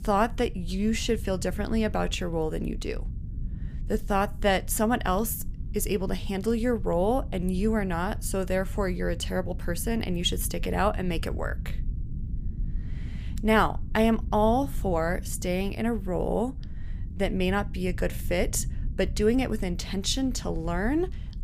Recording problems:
low rumble; faint; throughout; 20 dB below the speech

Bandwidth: 15 kHz